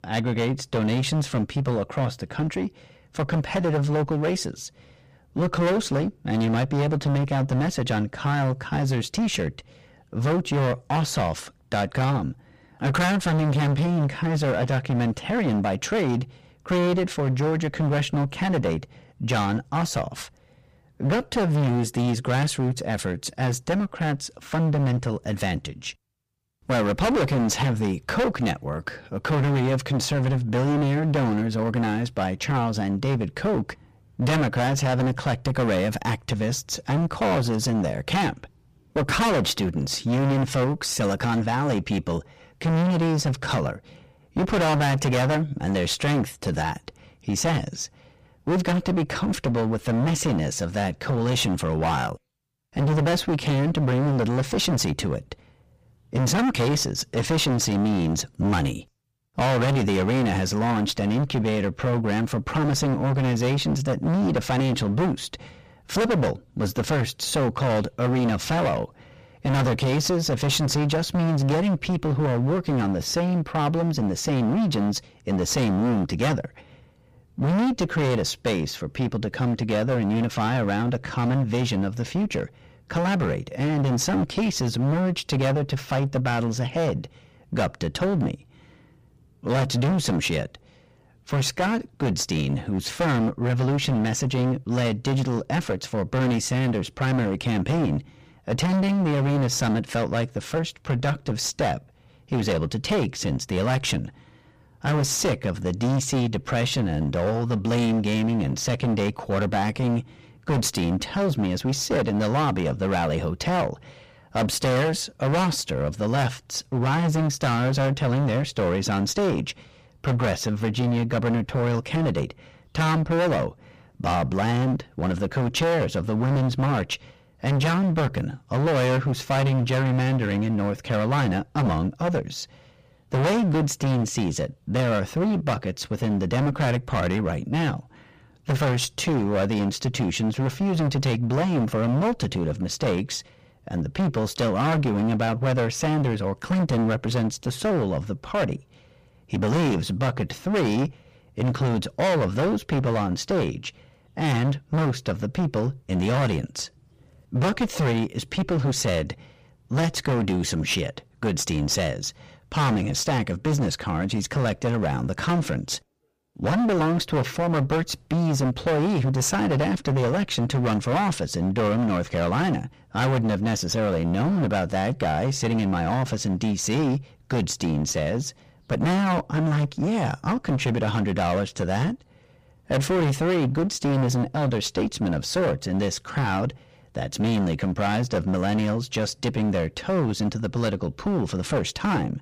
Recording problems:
distortion; heavy; 25% of the sound clipped

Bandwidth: 15 kHz